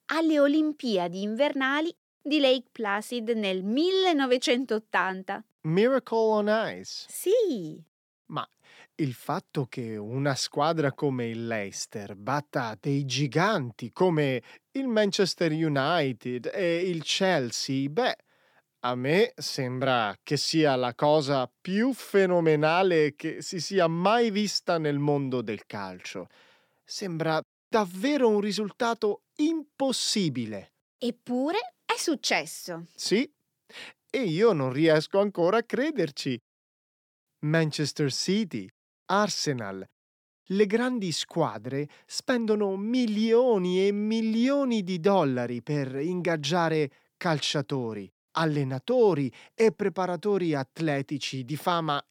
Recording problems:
none

